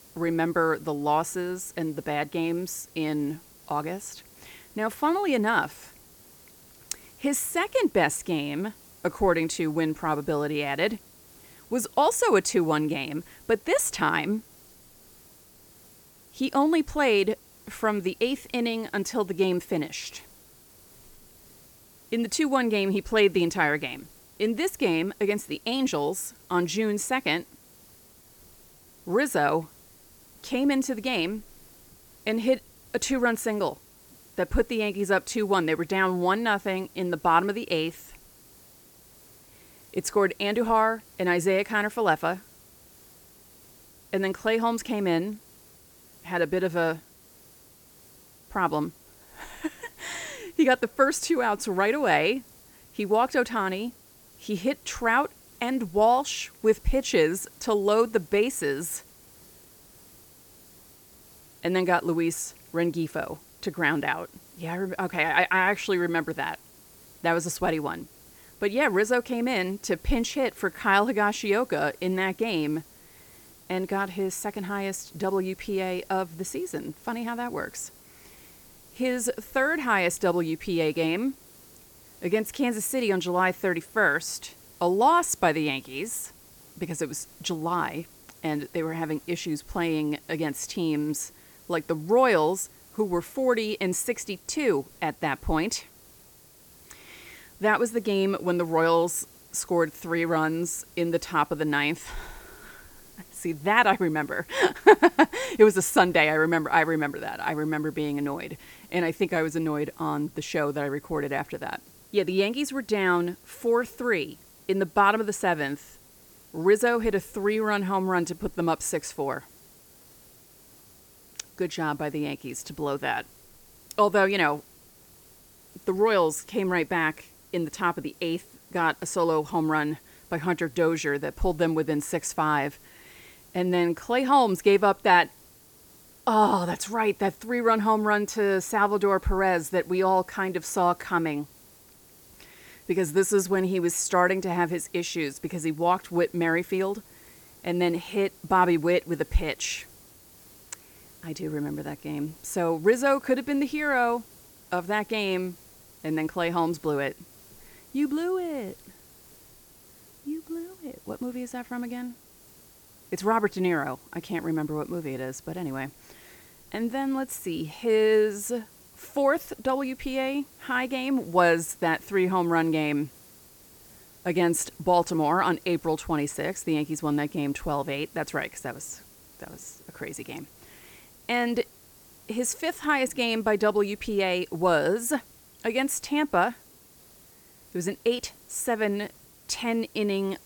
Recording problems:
hiss; faint; throughout; 25 dB below the speech

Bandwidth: 18.5 kHz